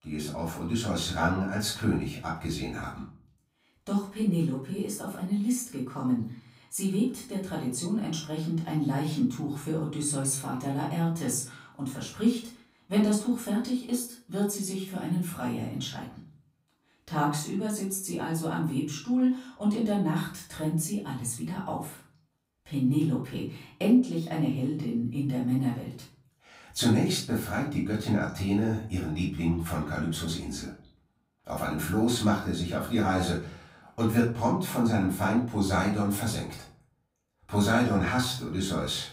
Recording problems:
off-mic speech; far
room echo; slight; dies away in 0.4 s

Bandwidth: 15.5 kHz